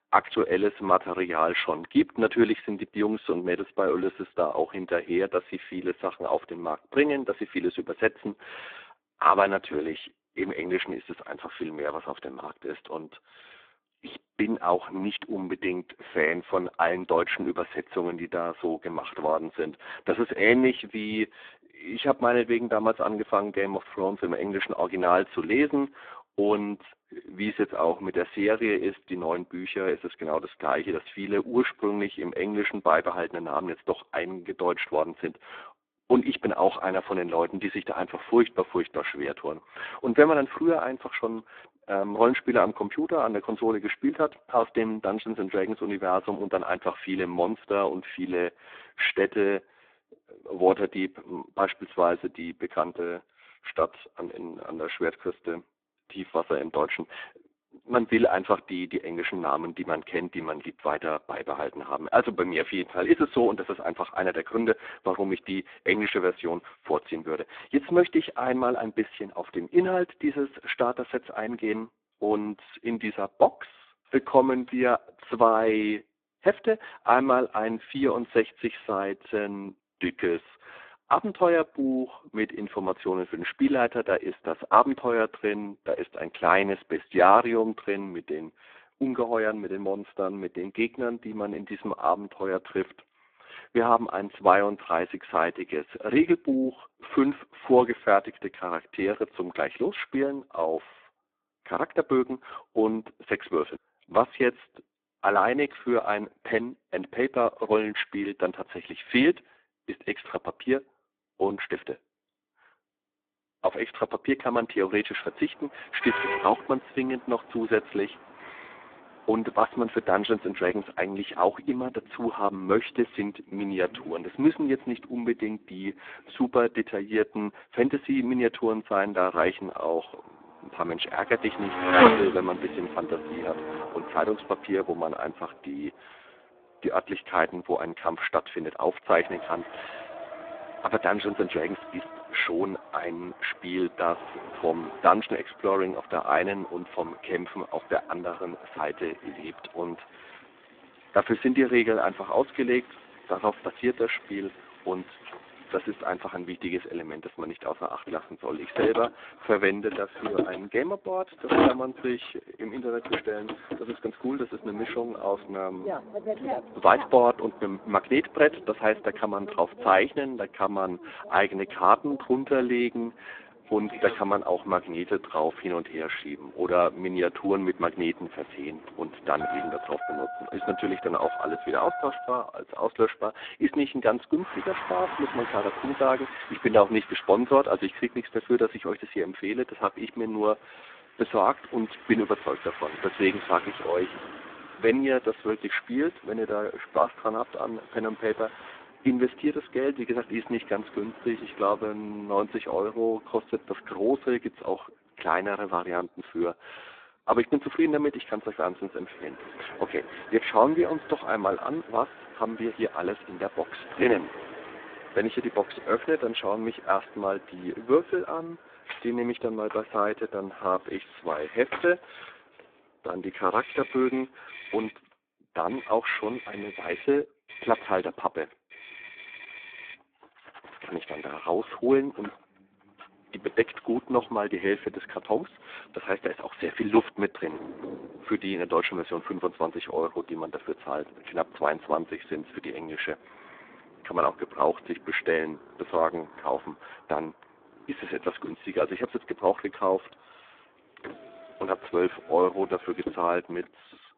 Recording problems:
phone-call audio; poor line
traffic noise; loud; from 1:55 on; 7 dB below the speech

